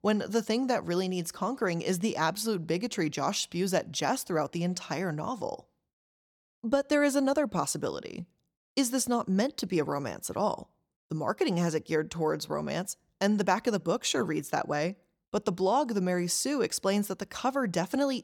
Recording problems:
none

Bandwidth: 18 kHz